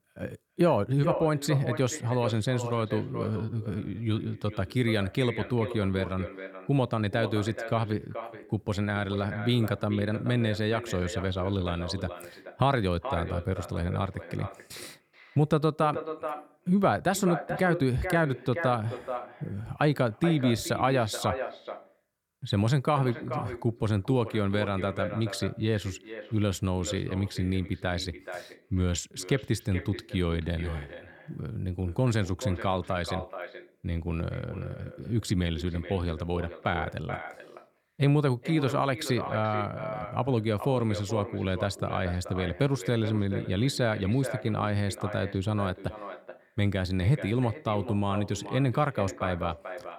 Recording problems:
echo of what is said; strong; throughout; 430 ms later, 10 dB below the speech

